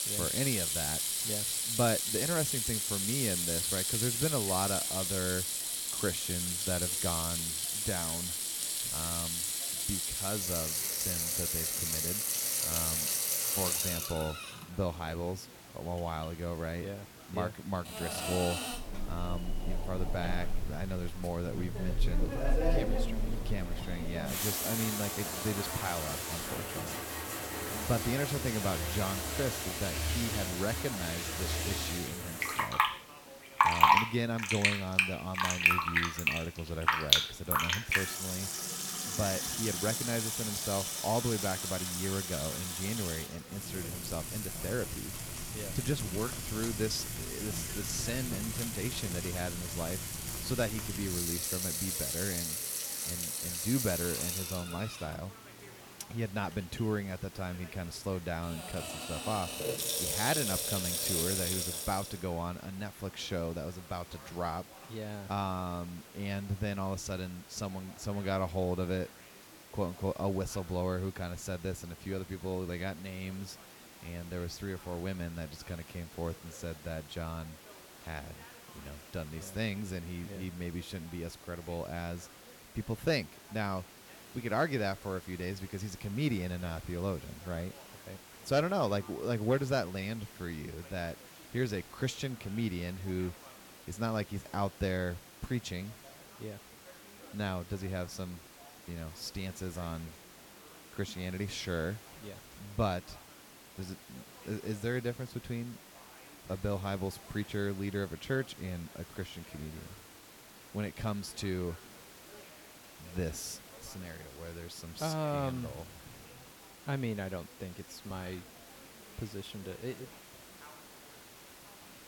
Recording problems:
household noises; very loud; until 1:02; 5 dB above the speech
hiss; noticeable; throughout; 15 dB below the speech
background chatter; faint; throughout; 3 voices, 20 dB below the speech

